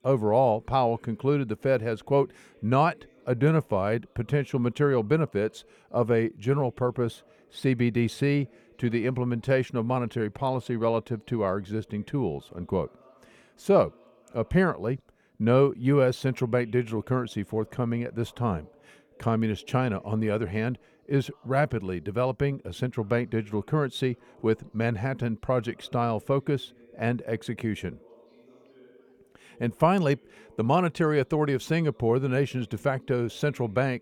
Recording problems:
background chatter; faint; throughout; 3 voices, 30 dB below the speech

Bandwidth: 18.5 kHz